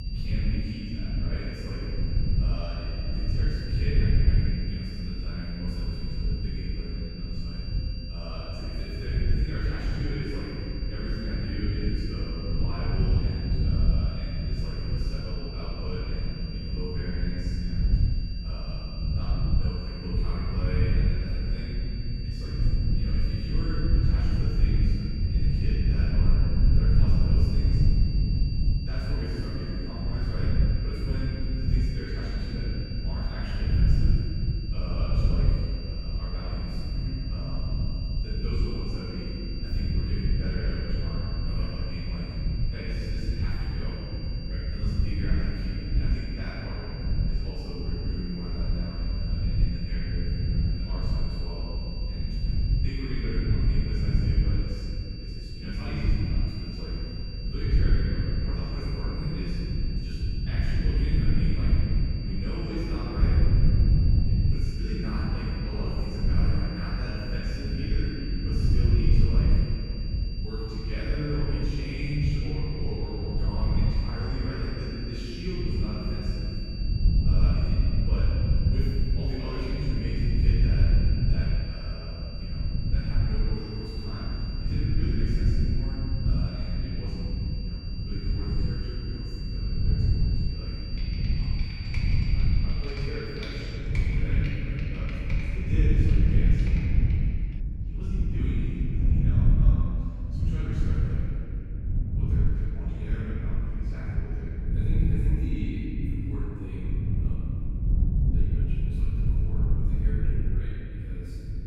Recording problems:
room echo; strong; dies away in 3 s
off-mic speech; far
high-pitched whine; loud; until 1:34; 4.5 kHz, 7 dB below the speech
low rumble; loud; throughout; 2 dB below the speech
keyboard typing; noticeable; from 1:31 to 1:37; peak 3 dB below the speech

